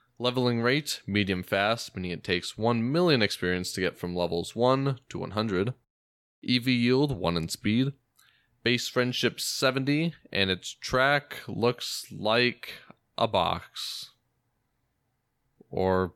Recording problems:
none

